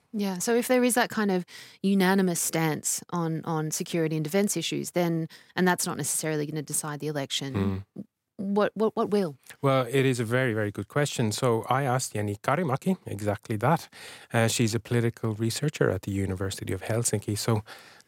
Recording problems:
none

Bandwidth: 16 kHz